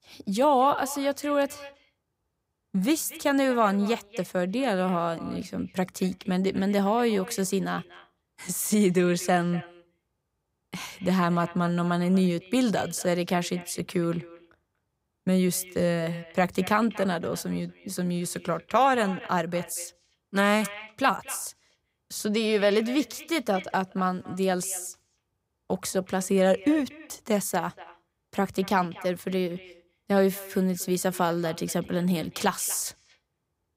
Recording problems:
echo of what is said; faint; throughout; 240 ms later, 20 dB below the speech

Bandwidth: 15.5 kHz